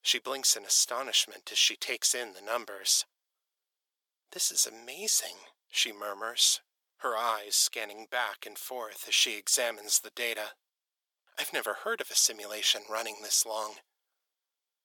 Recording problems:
thin; very; fading below 500 Hz

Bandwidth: 18 kHz